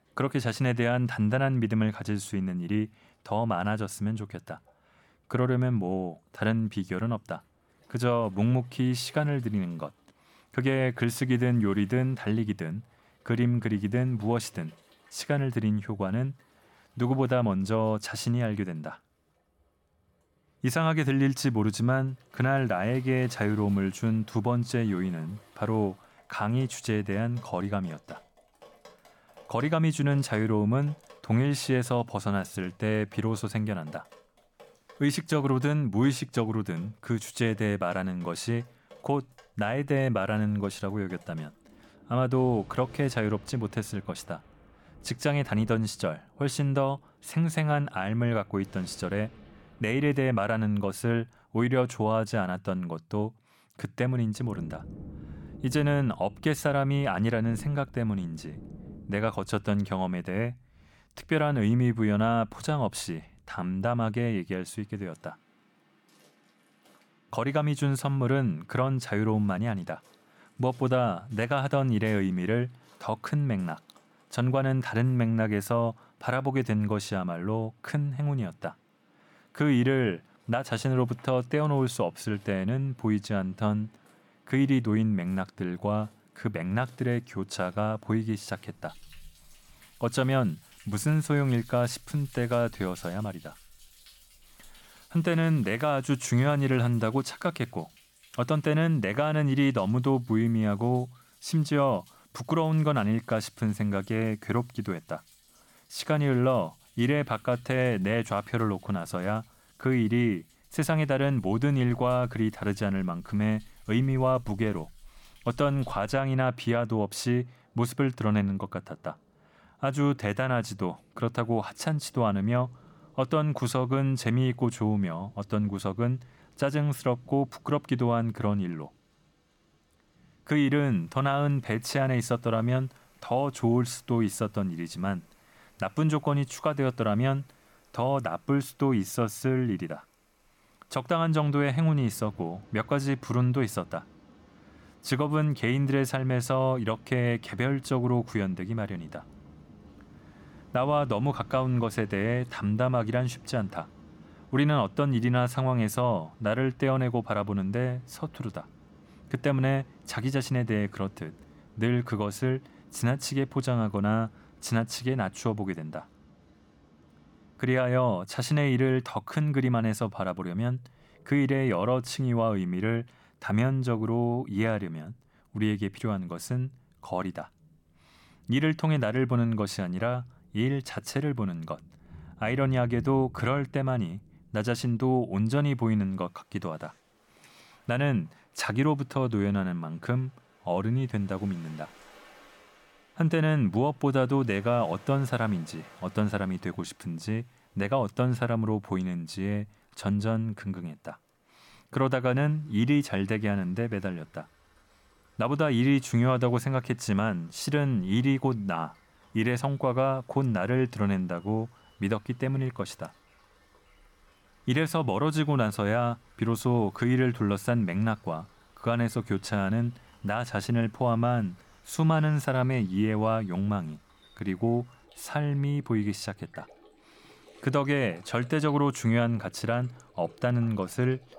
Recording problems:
rain or running water; faint; throughout; 25 dB below the speech

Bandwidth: 17.5 kHz